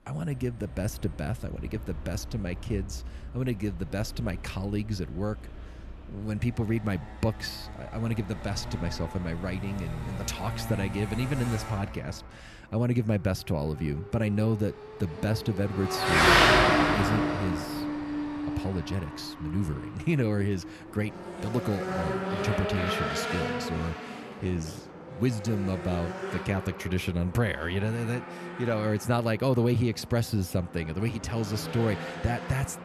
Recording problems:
traffic noise; very loud; throughout; as loud as the speech

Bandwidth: 13.5 kHz